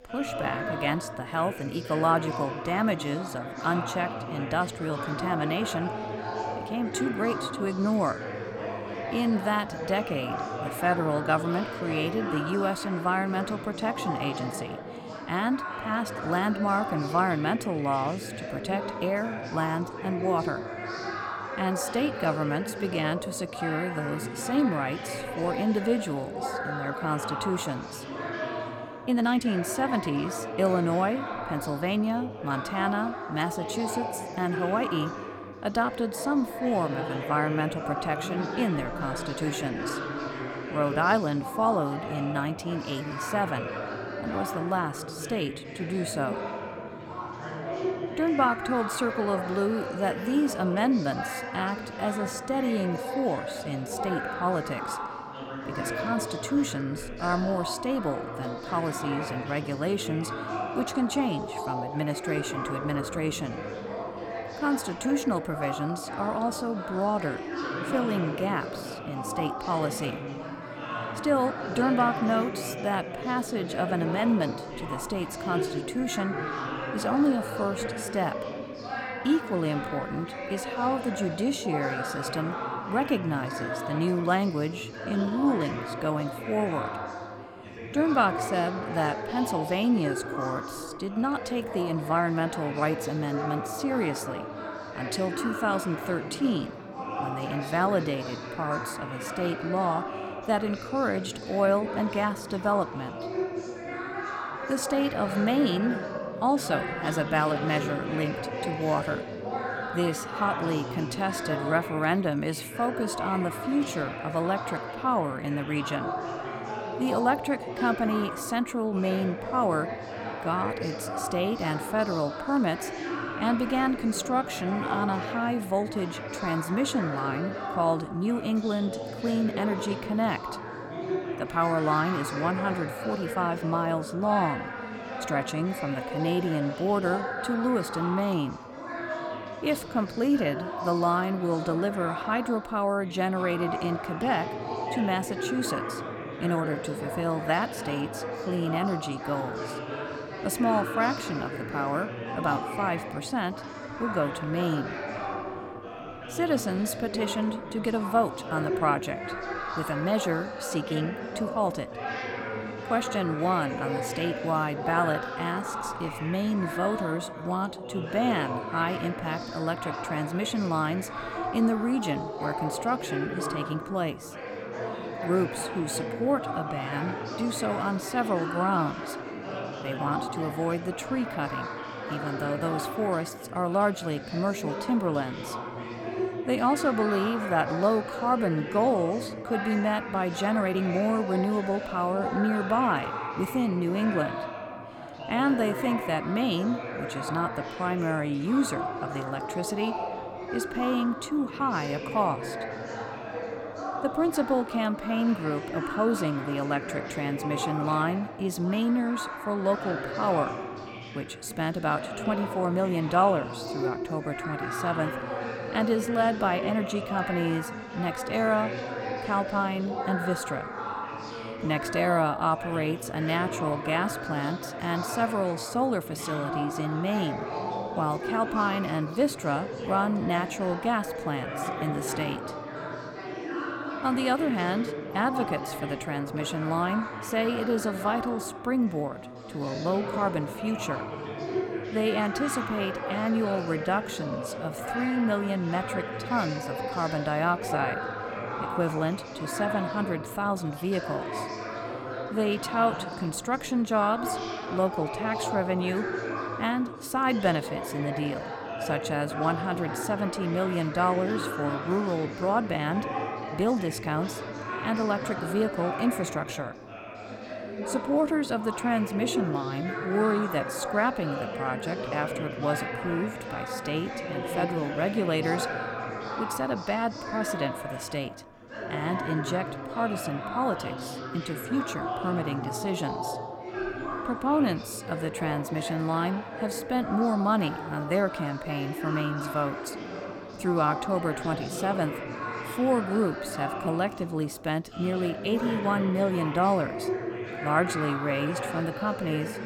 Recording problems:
chatter from many people; loud; throughout; 5 dB below the speech
uneven, jittery; strongly; from 29 s to 4:15

